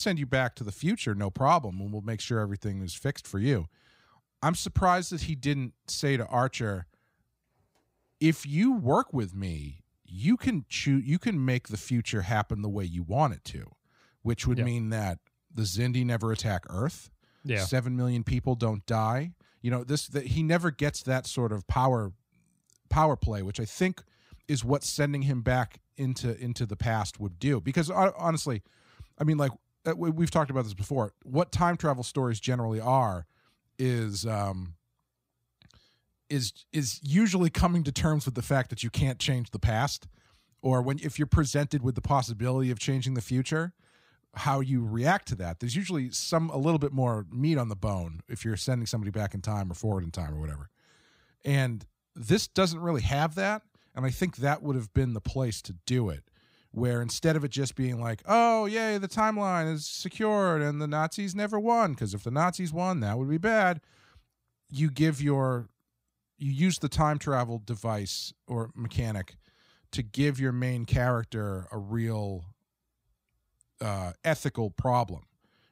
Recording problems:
abrupt cut into speech; at the start

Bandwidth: 15.5 kHz